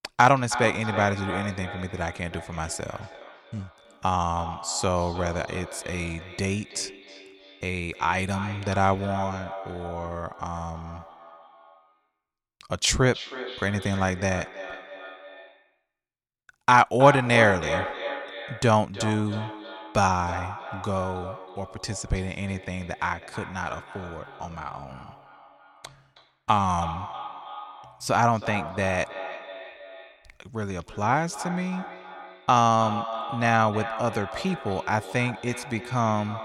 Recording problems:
echo of what is said; strong; throughout; 320 ms later, 10 dB below the speech

